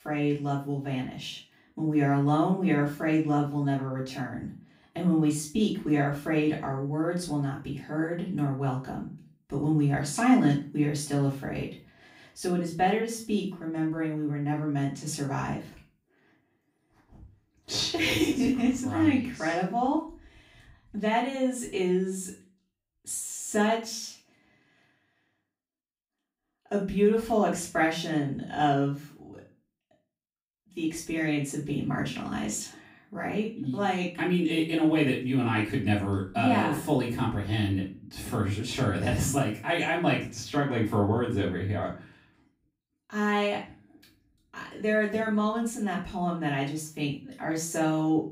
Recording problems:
off-mic speech; far
room echo; slight; dies away in 0.3 s

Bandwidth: 15.5 kHz